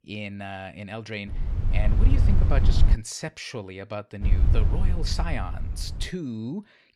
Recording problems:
low rumble; loud; from 1.5 to 3 s and from 4 to 6 s; 5 dB below the speech

